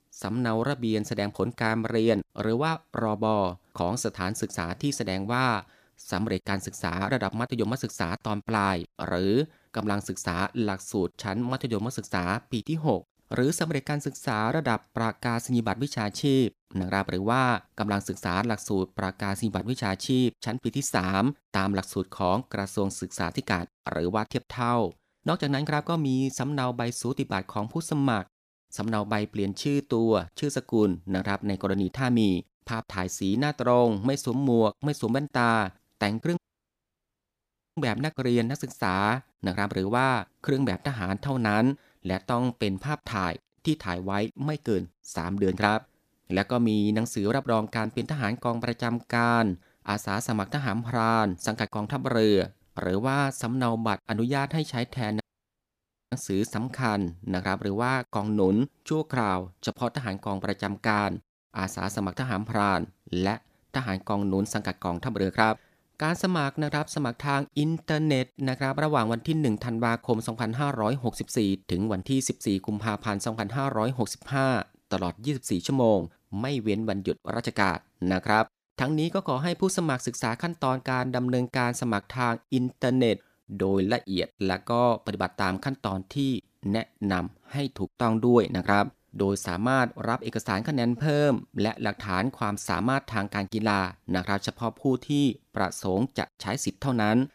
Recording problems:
audio cutting out; at 36 s for 1.5 s and at 55 s for 1 s

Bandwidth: 14.5 kHz